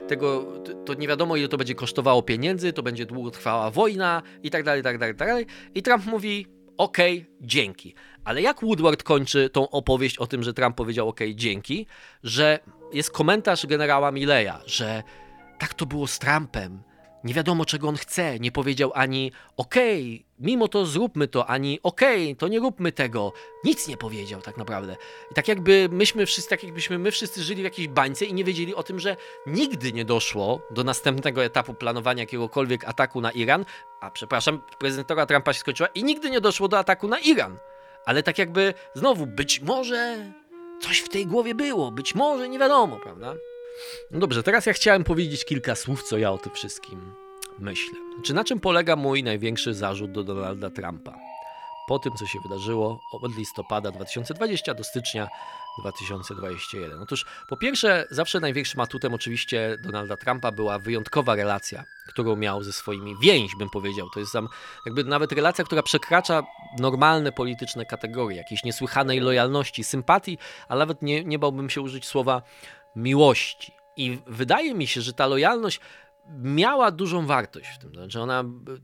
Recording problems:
background music; noticeable; throughout; 20 dB below the speech

